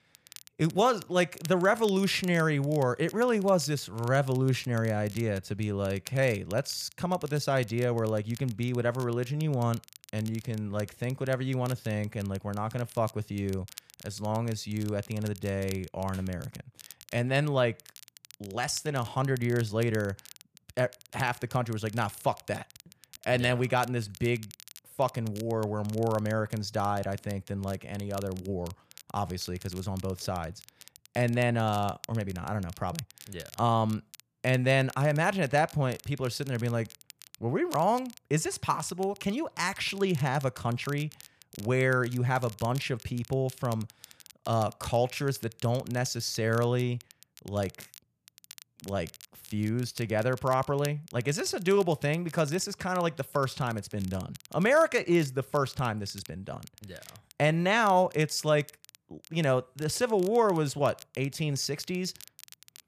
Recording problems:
crackle, like an old record; faint; 20 dB below the speech

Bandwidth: 14.5 kHz